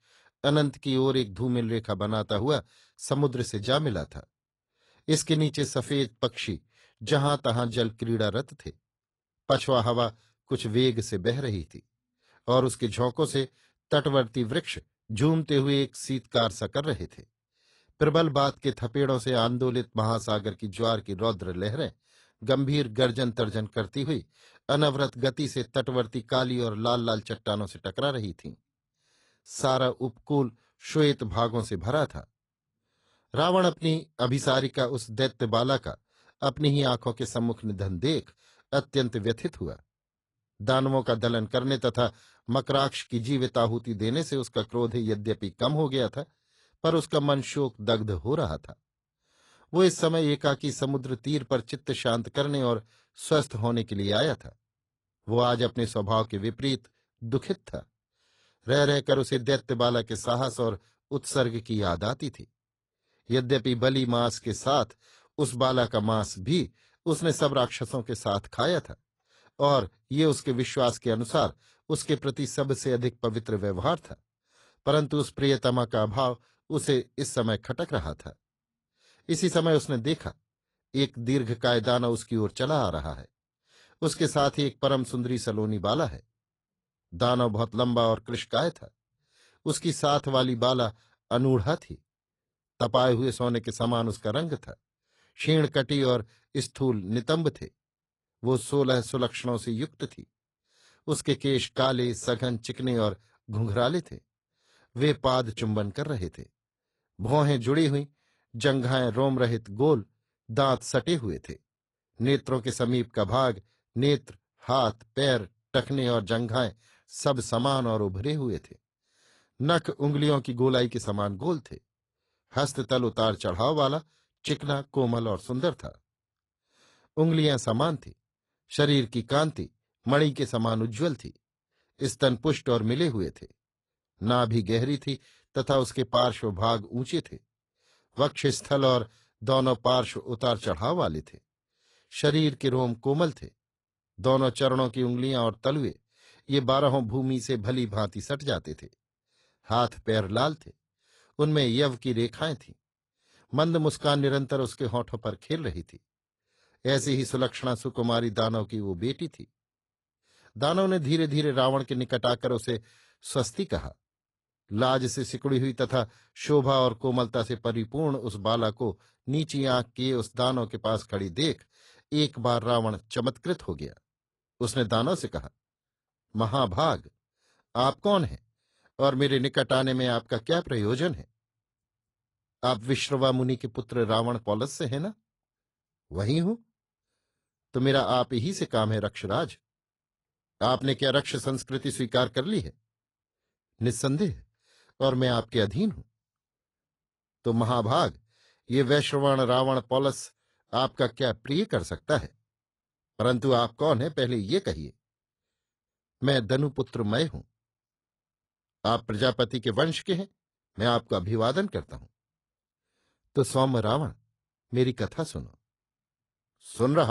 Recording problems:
garbled, watery; slightly; nothing above 10.5 kHz
abrupt cut into speech; at the end

